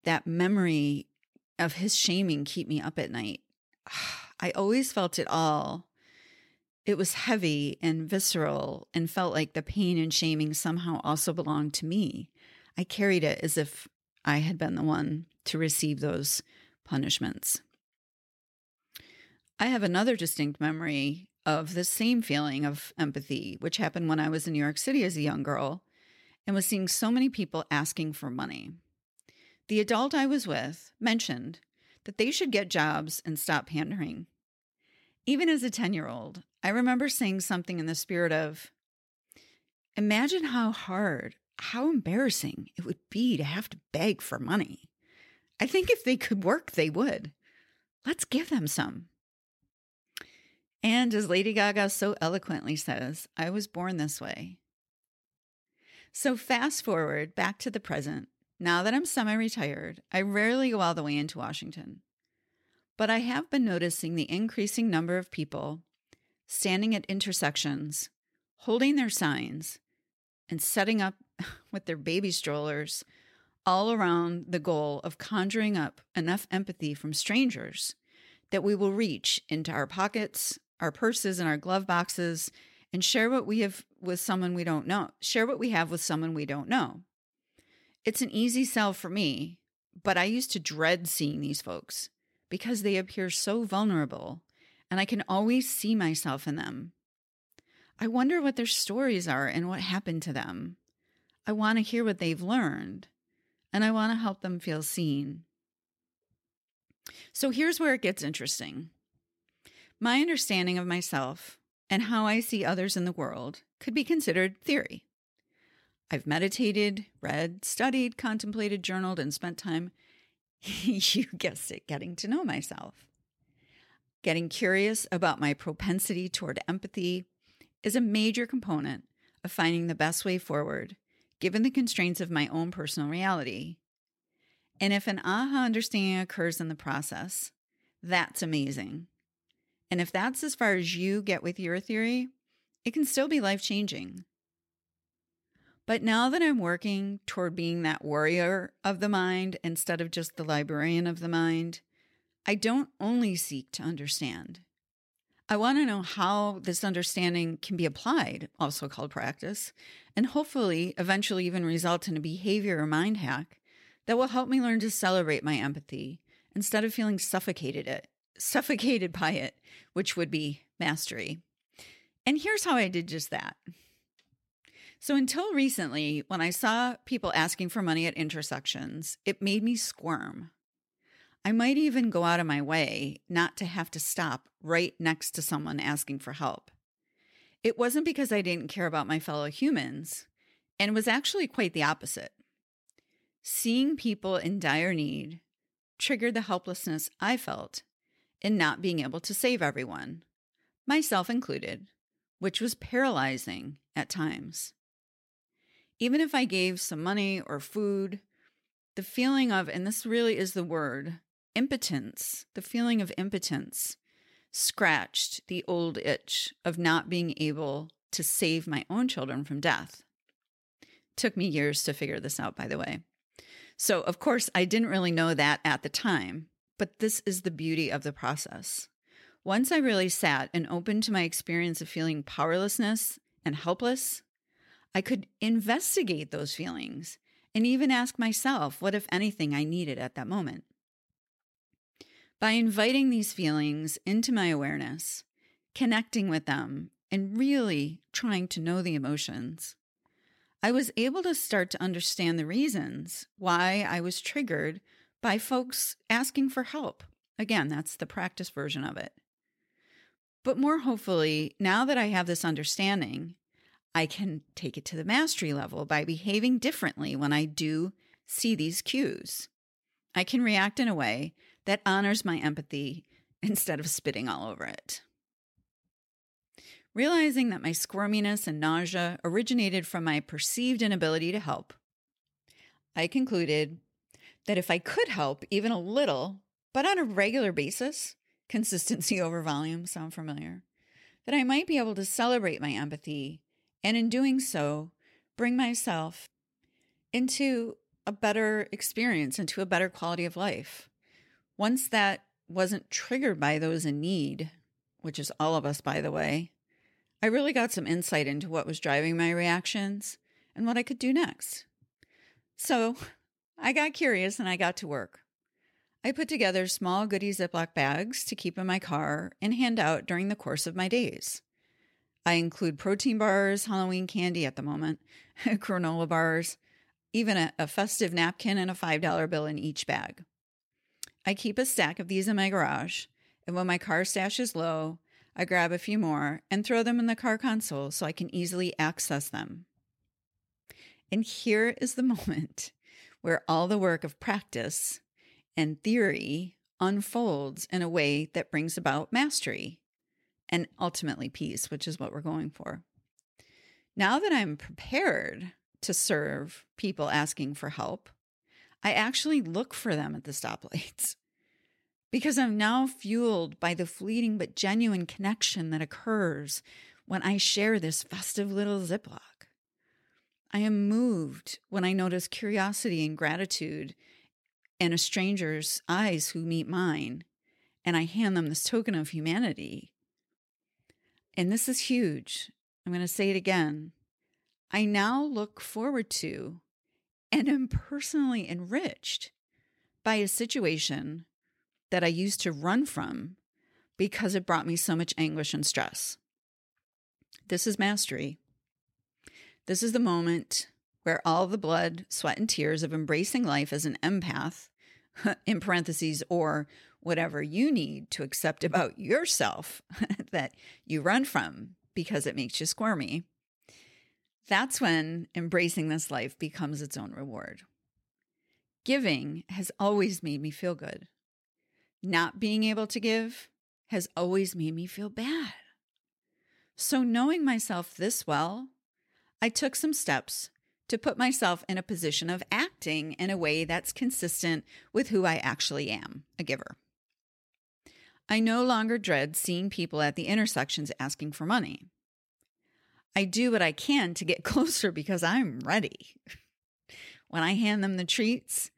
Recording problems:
none

